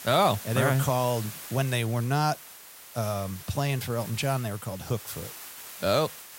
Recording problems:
hiss; noticeable; throughout; 15 dB below the speech

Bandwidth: 16 kHz